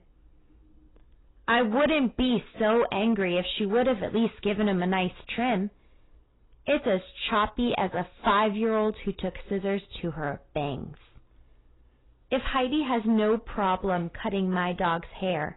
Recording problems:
garbled, watery; badly; nothing above 4 kHz
distortion; slight; 5% of the sound clipped

